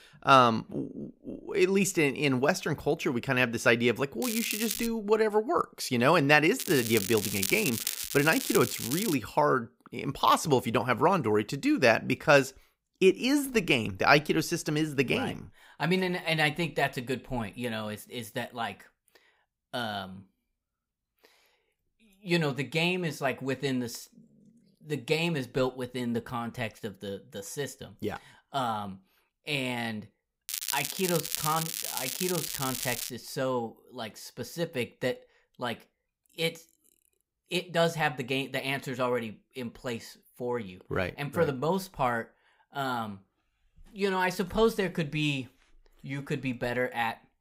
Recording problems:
crackling; loud; at 4 s, from 6.5 to 9 s and from 30 to 33 s; 4 dB below the speech

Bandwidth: 15.5 kHz